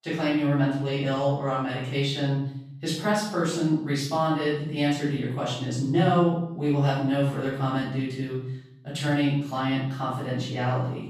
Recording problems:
off-mic speech; far
room echo; noticeable; dies away in 0.7 s

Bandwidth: 15 kHz